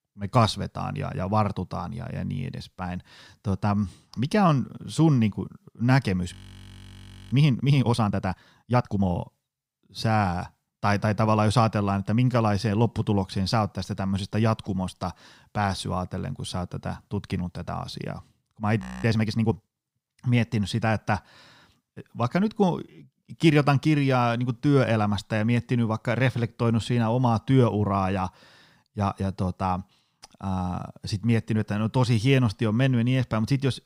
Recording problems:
audio freezing; at 6.5 s for 1 s and at 19 s

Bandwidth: 15.5 kHz